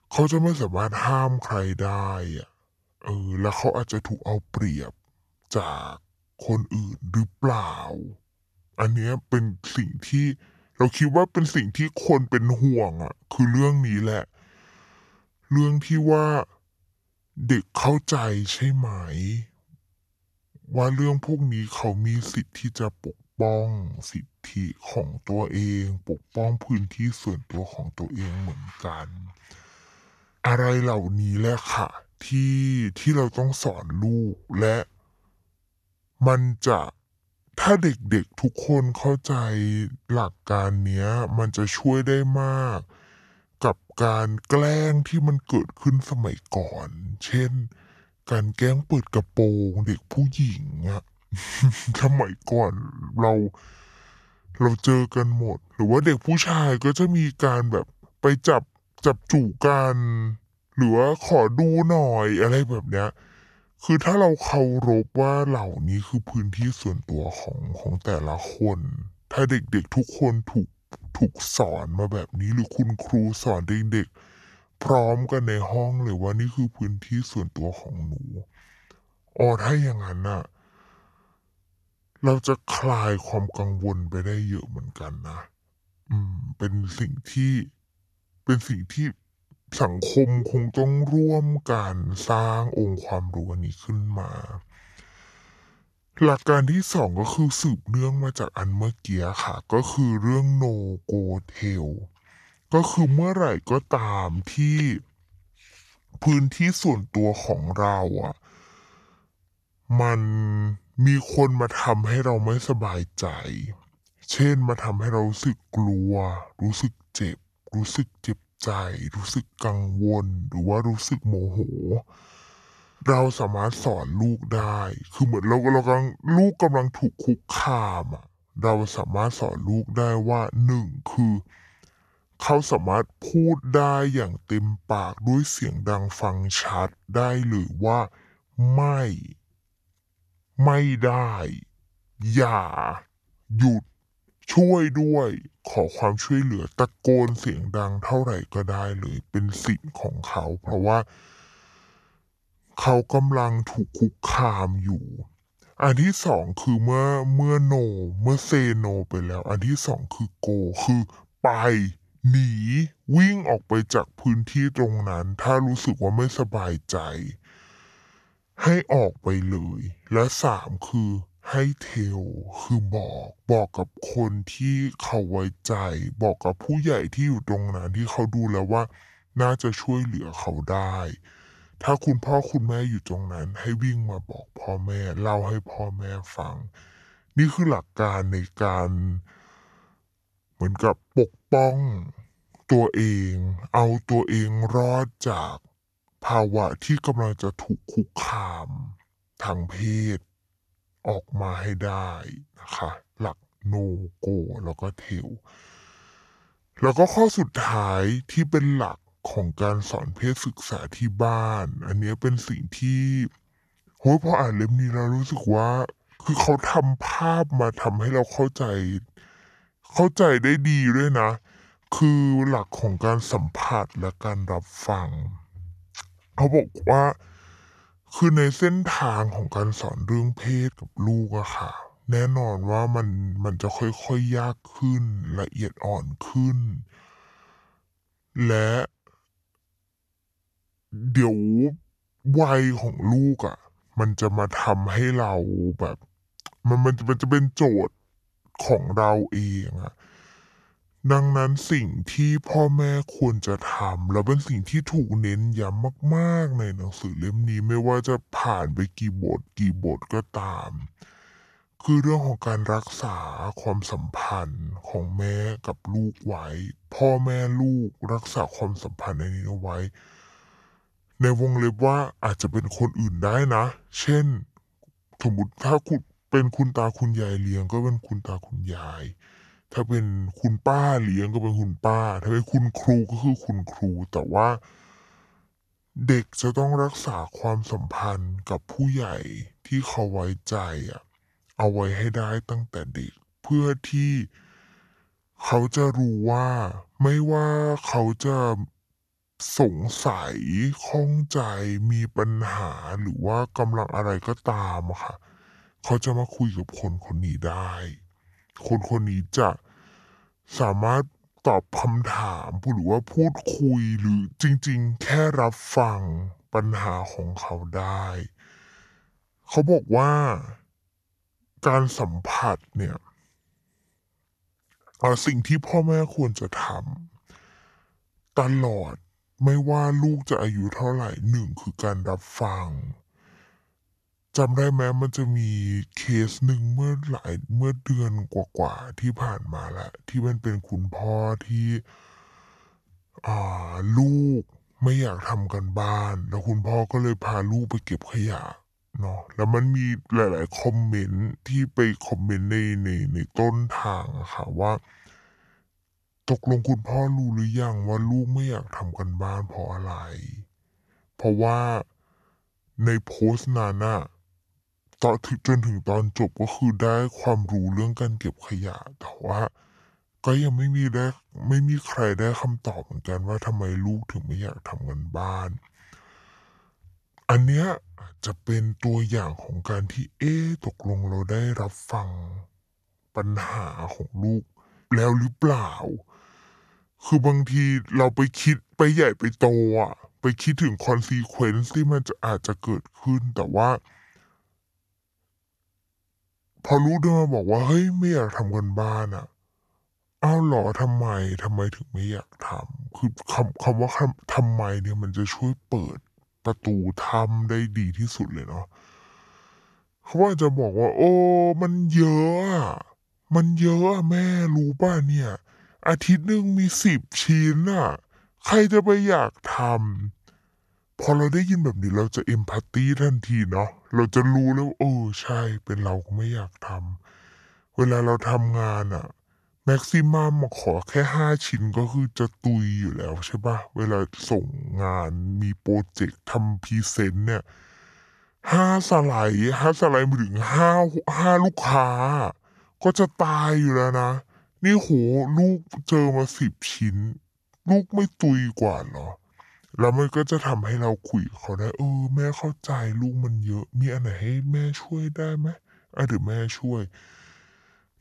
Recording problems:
wrong speed and pitch; too slow and too low; 0.7 times normal speed

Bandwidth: 12.5 kHz